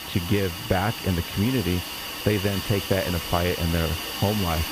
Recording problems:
high frequencies cut off; severe; nothing above 4 kHz
squashed, flat; somewhat
hiss; loud; throughout; 5 dB below the speech

